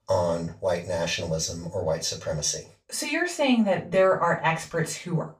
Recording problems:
off-mic speech; far
room echo; slight; dies away in 0.2 s

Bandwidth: 15 kHz